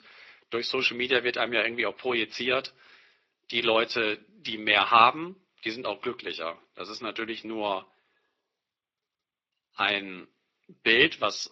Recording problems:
thin; very; fading below 300 Hz
garbled, watery; slightly

